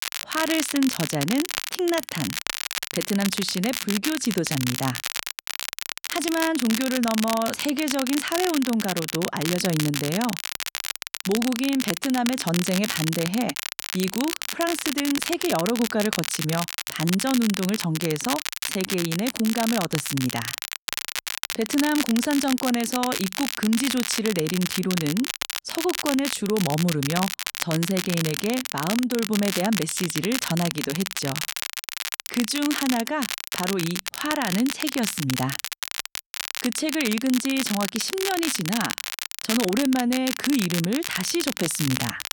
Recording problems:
crackle, like an old record; loud; 3 dB below the speech

